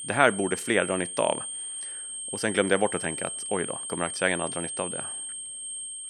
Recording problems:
high-pitched whine; loud; throughout; 8.5 kHz, 5 dB below the speech

